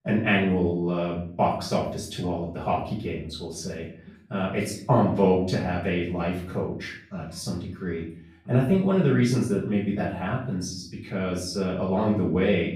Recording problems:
off-mic speech; far
room echo; noticeable; dies away in 0.5 s

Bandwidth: 15 kHz